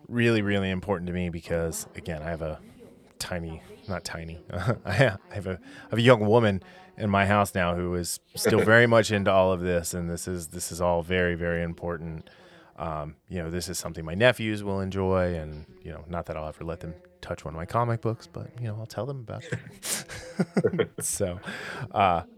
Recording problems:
voice in the background; faint; throughout; 30 dB below the speech

